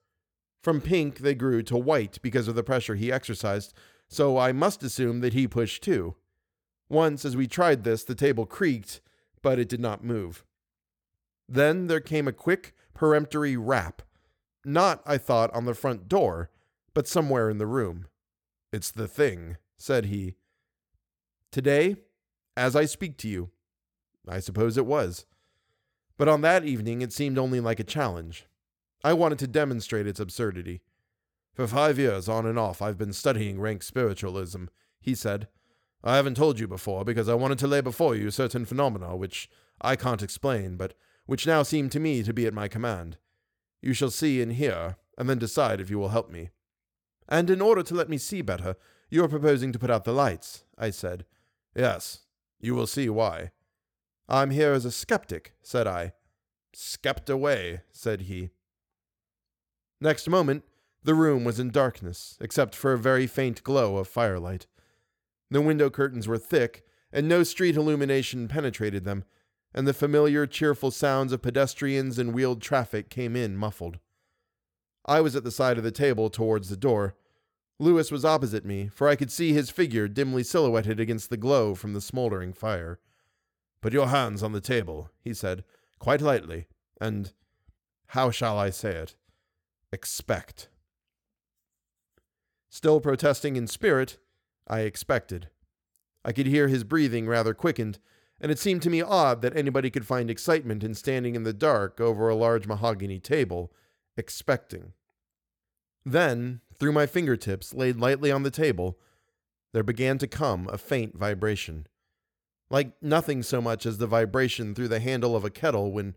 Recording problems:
none

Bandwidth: 18.5 kHz